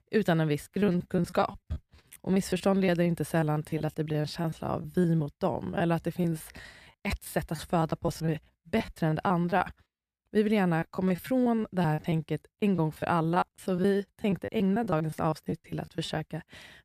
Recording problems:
choppy; very; 16% of the speech affected

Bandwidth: 14.5 kHz